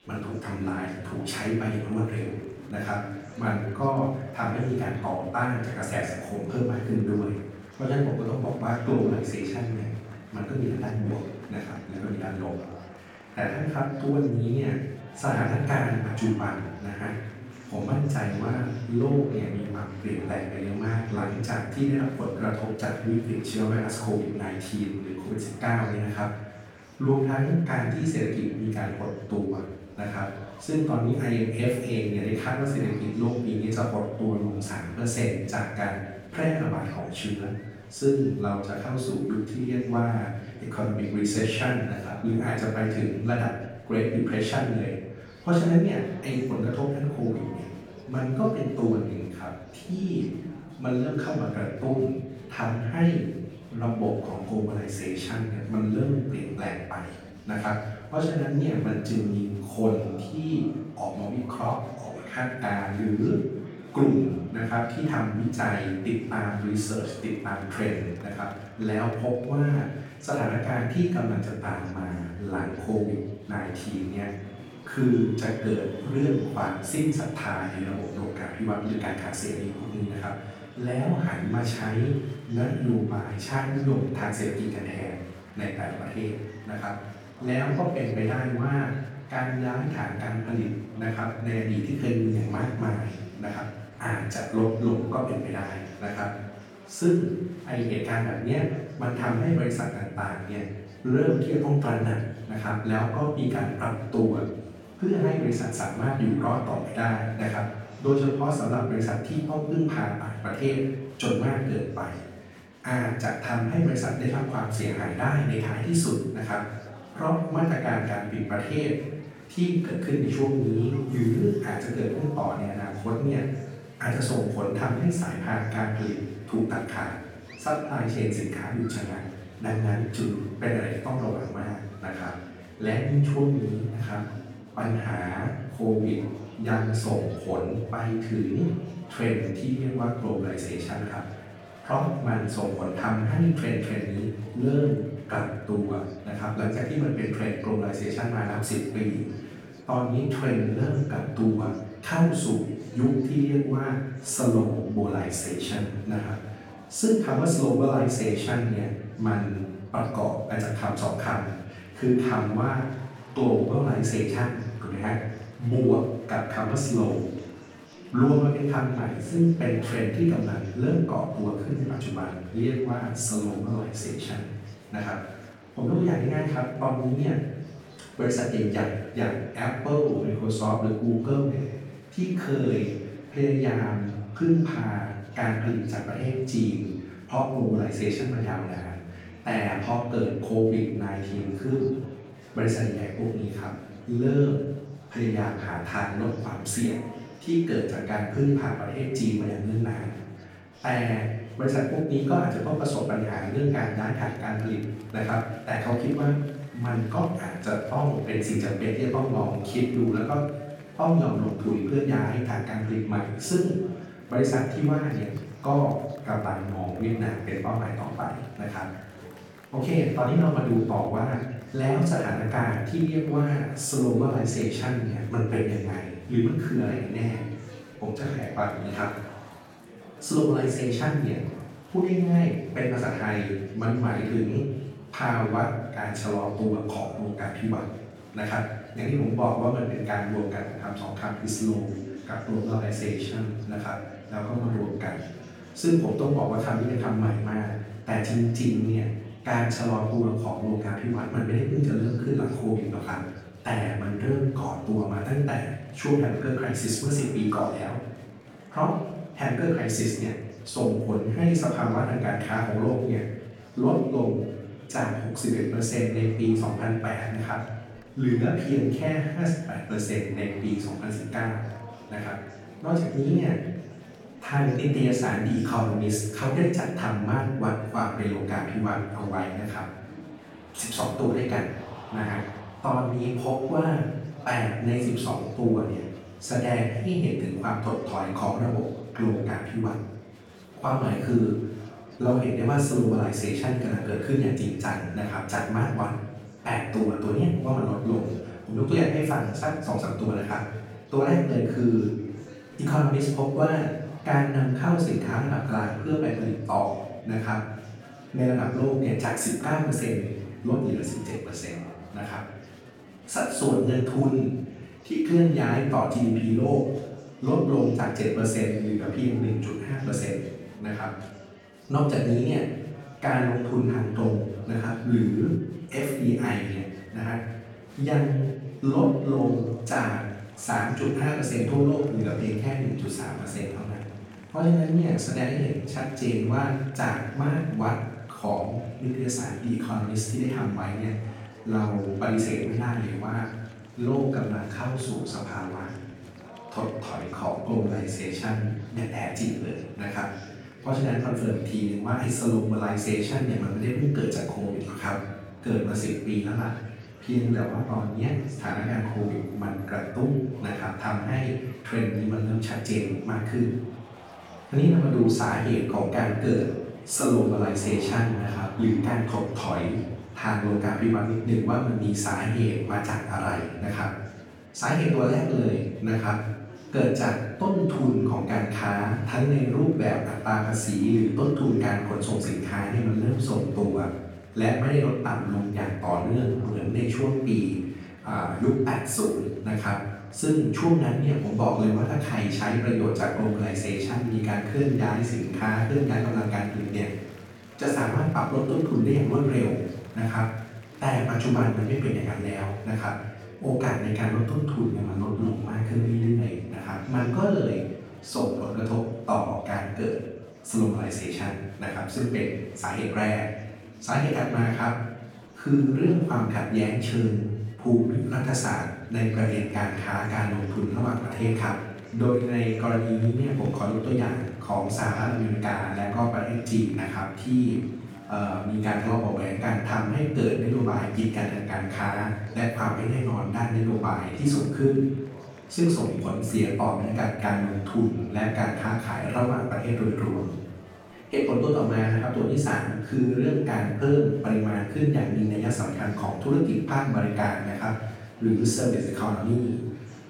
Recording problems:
off-mic speech; far
room echo; noticeable; dies away in 0.8 s
murmuring crowd; noticeable; throughout; 20 dB below the speech

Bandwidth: 18 kHz